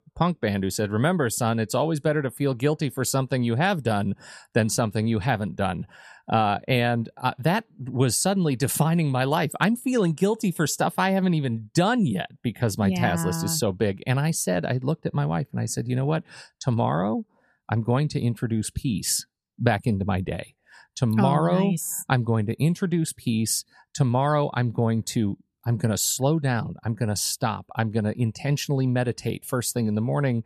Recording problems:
none

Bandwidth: 14.5 kHz